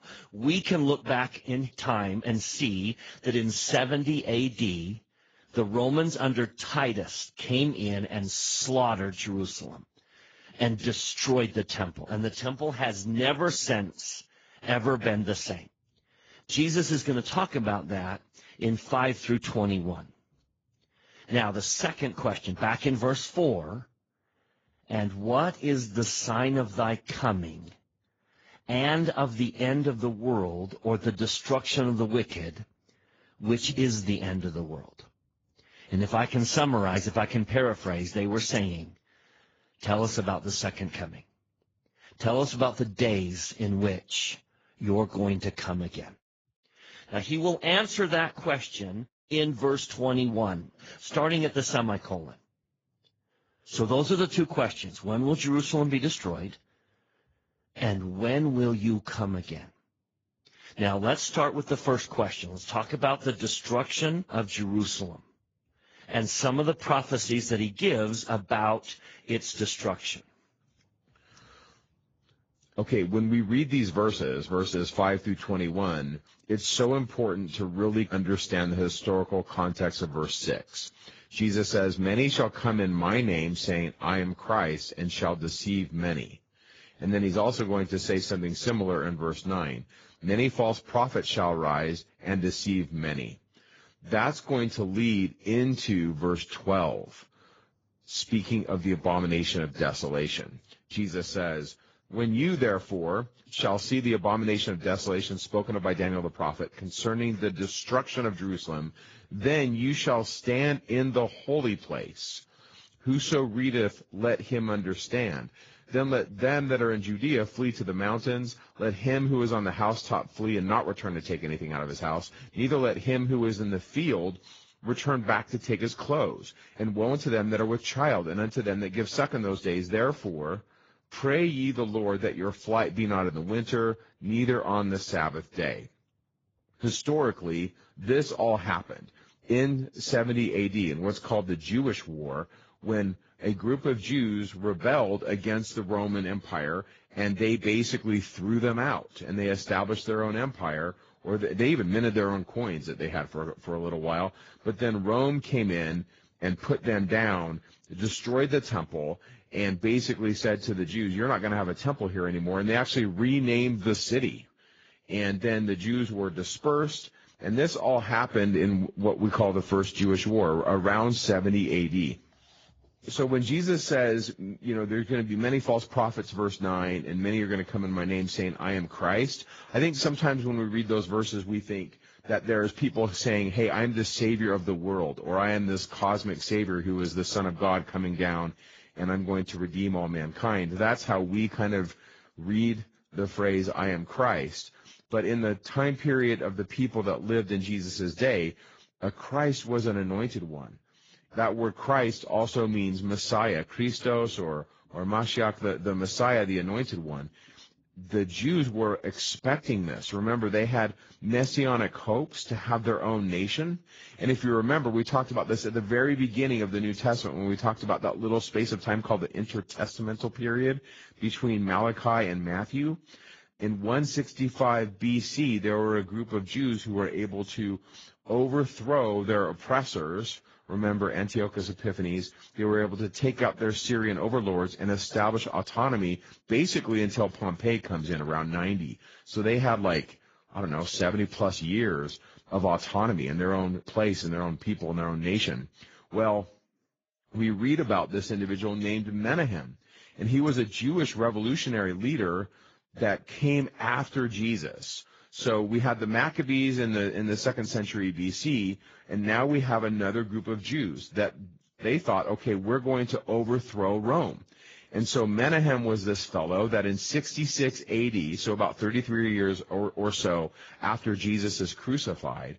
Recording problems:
garbled, watery; badly; nothing above 7.5 kHz

